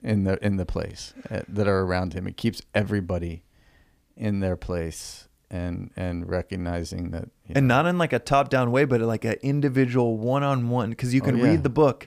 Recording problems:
none

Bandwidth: 15 kHz